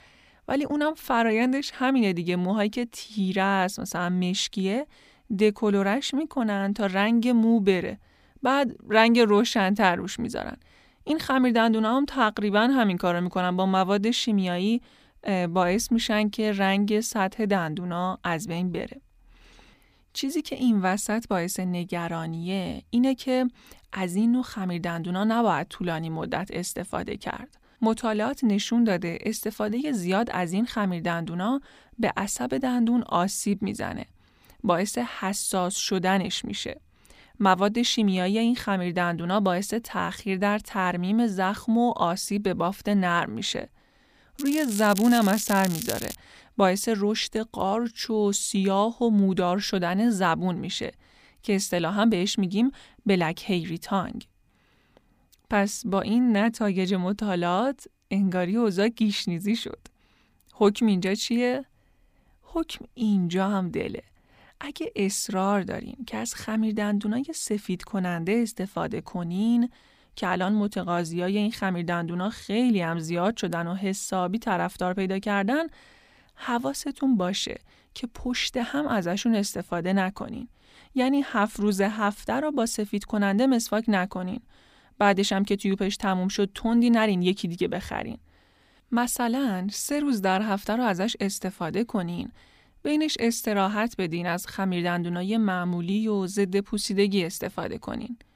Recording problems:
crackling; loud; from 44 to 46 s; 9 dB below the speech

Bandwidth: 15 kHz